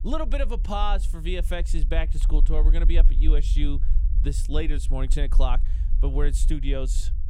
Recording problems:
low rumble; noticeable; throughout; 15 dB below the speech

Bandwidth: 18.5 kHz